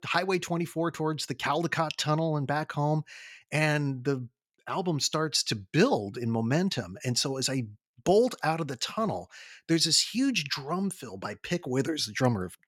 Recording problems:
none

